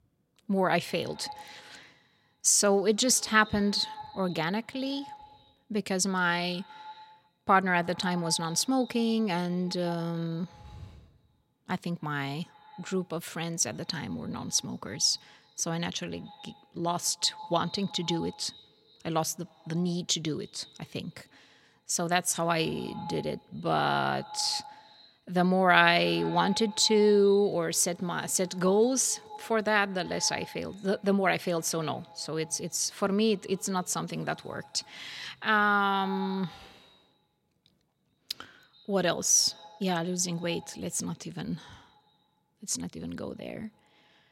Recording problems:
echo of what is said; faint; throughout; 140 ms later, 20 dB below the speech

